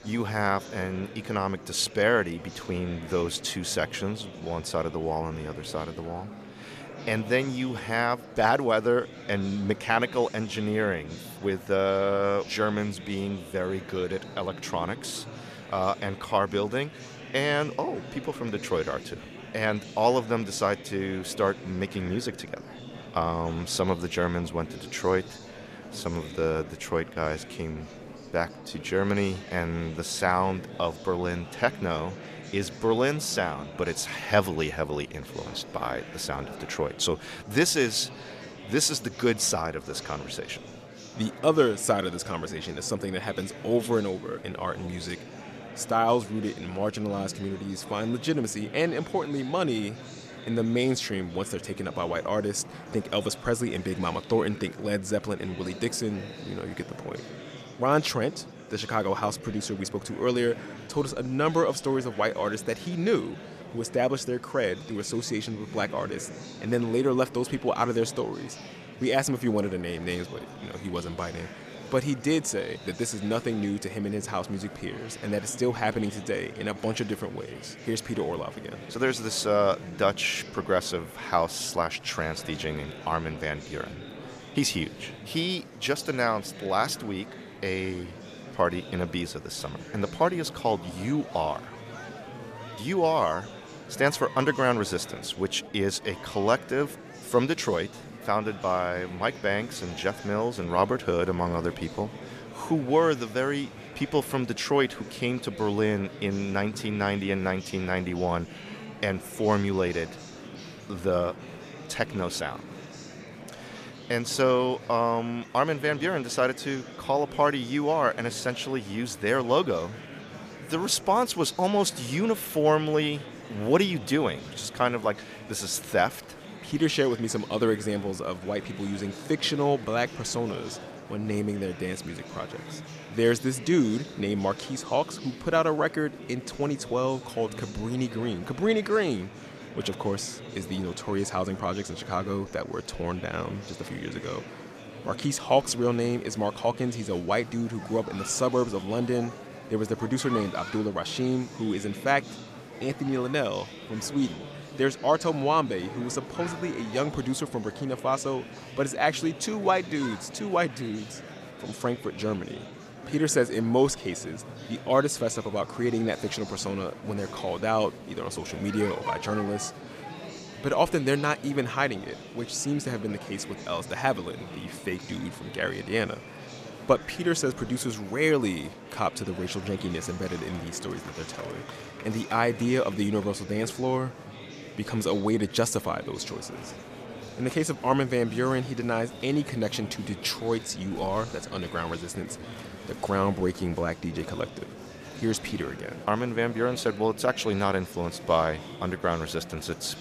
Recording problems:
murmuring crowd; noticeable; throughout; 15 dB below the speech

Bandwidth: 14.5 kHz